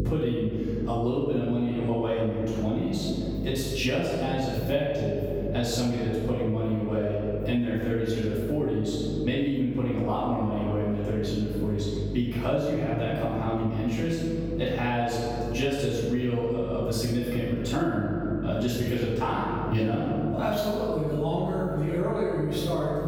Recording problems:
room echo; strong; dies away in 1.6 s
off-mic speech; far
squashed, flat; somewhat
electrical hum; noticeable; throughout; 50 Hz, 20 dB below the speech

